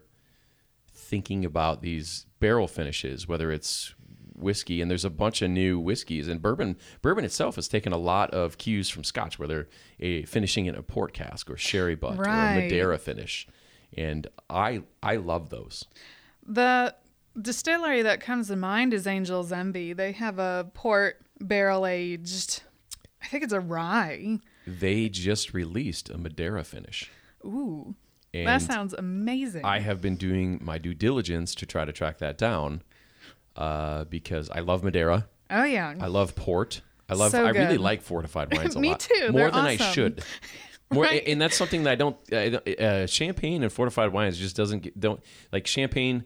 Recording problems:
none

